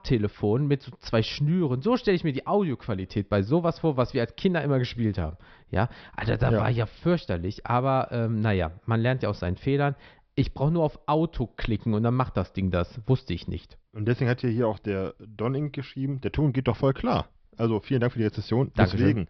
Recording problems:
high frequencies cut off; noticeable; nothing above 5.5 kHz

